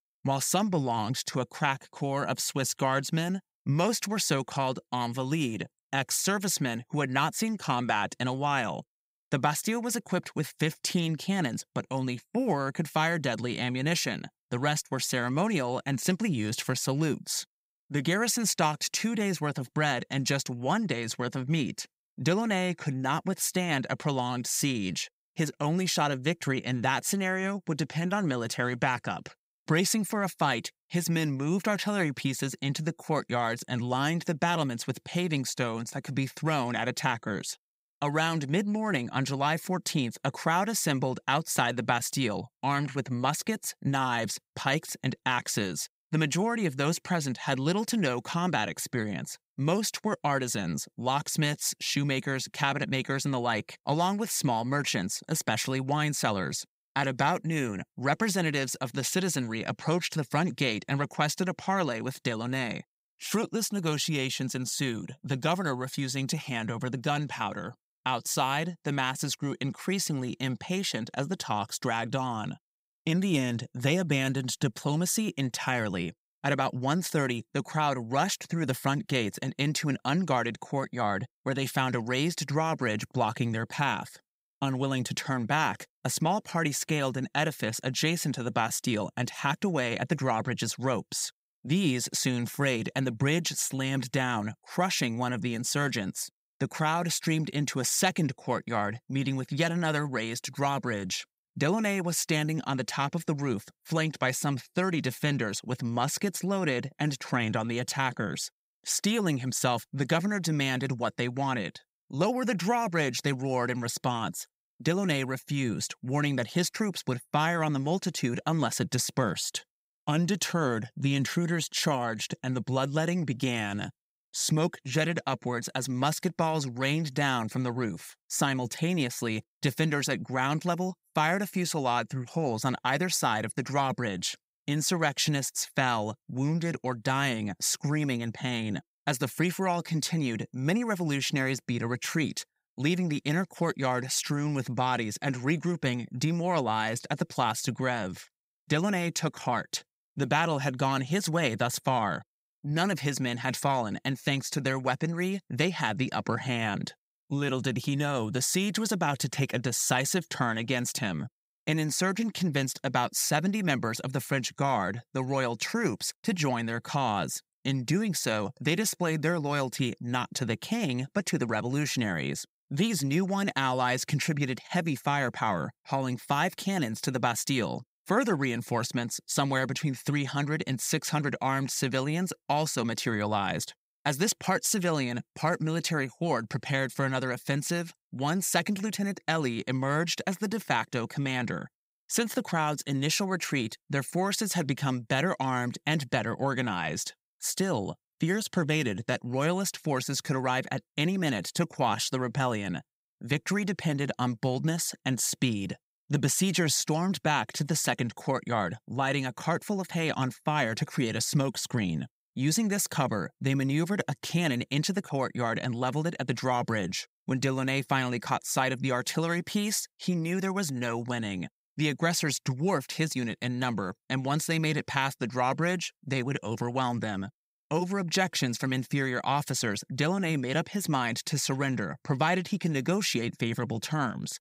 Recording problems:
none

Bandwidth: 15.5 kHz